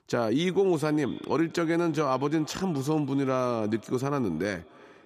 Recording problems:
echo of what is said; faint; throughout; 300 ms later, 25 dB below the speech

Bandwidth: 14.5 kHz